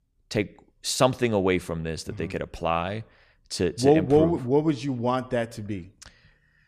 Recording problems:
none

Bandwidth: 14.5 kHz